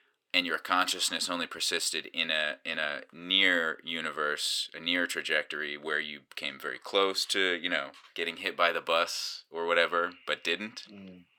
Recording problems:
thin; somewhat; fading below 450 Hz

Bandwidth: 18 kHz